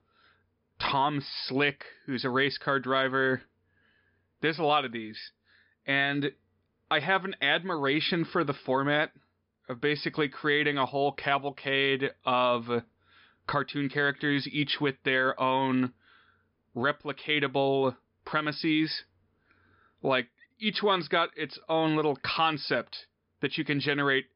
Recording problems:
high frequencies cut off; noticeable; nothing above 5.5 kHz

